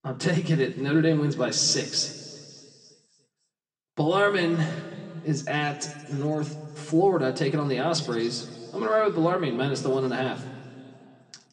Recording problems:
room echo; slight; dies away in 2.2 s
off-mic speech; somewhat distant

